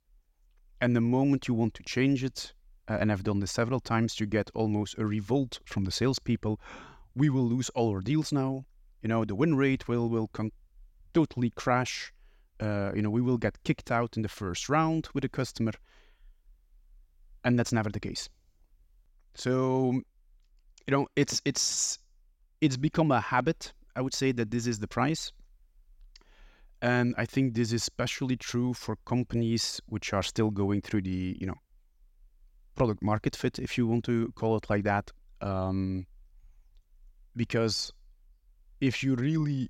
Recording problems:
none

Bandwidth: 16.5 kHz